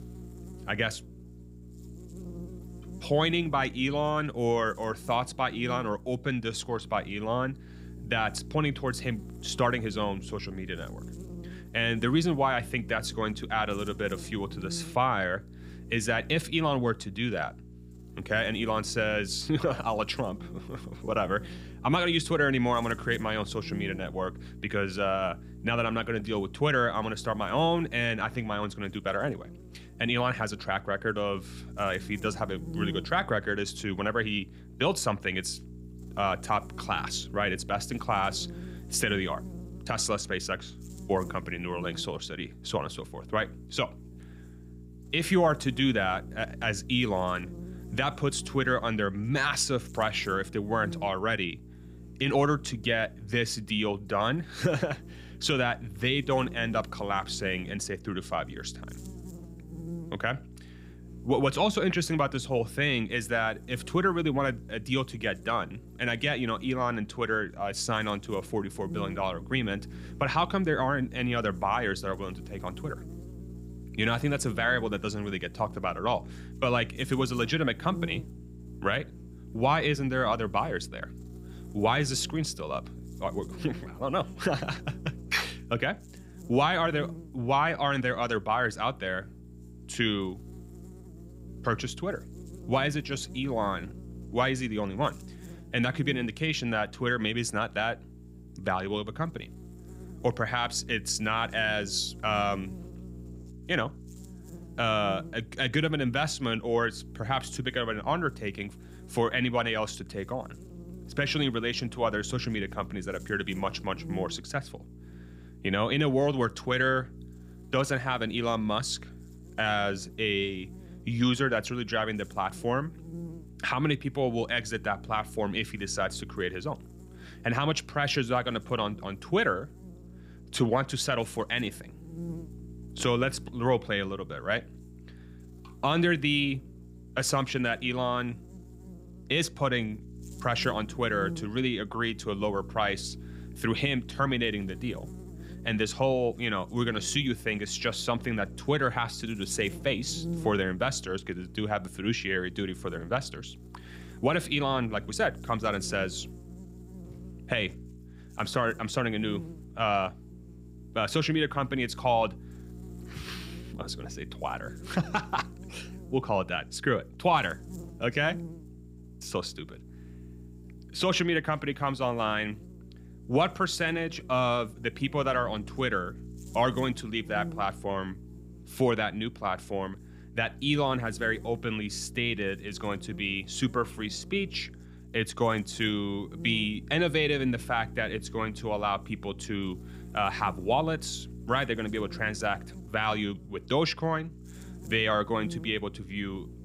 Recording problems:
electrical hum; faint; throughout; 60 Hz, 20 dB below the speech

